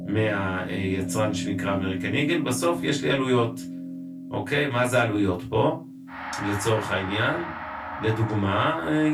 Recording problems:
off-mic speech; far
room echo; very slight; dies away in 0.2 s
background music; loud; throughout; 9 dB below the speech
abrupt cut into speech; at the end

